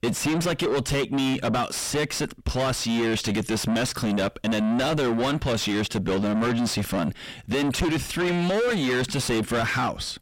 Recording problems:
distortion; heavy; 6 dB below the speech

